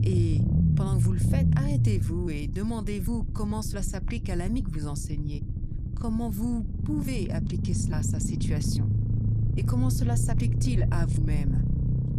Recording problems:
low rumble; loud; throughout; 2 dB below the speech

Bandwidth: 15 kHz